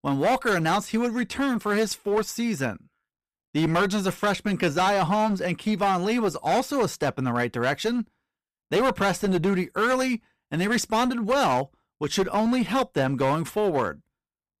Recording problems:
distortion; slight; 13% of the sound clipped

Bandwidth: 14.5 kHz